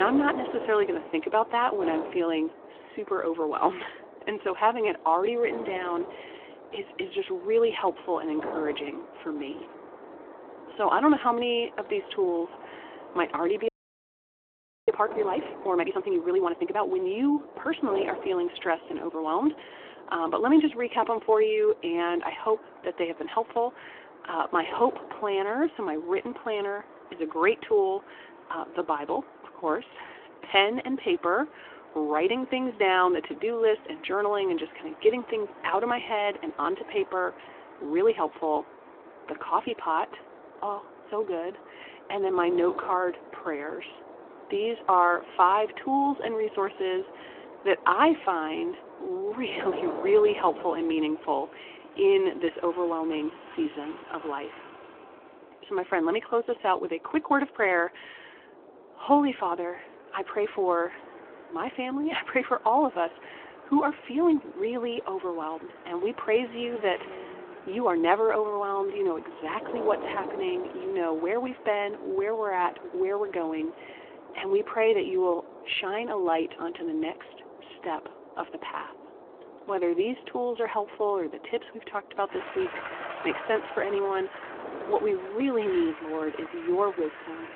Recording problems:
phone-call audio
wind noise on the microphone; occasional gusts; 15 dB below the speech
traffic noise; faint; throughout; 20 dB below the speech
abrupt cut into speech; at the start
audio freezing; at 14 s for 1 s

